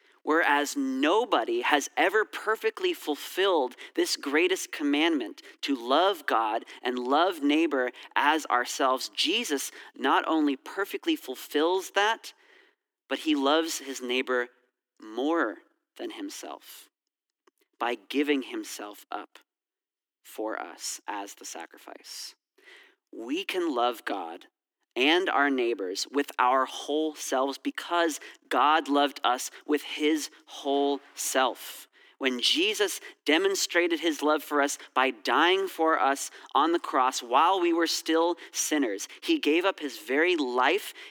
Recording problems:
thin; very slightly; fading below 300 Hz

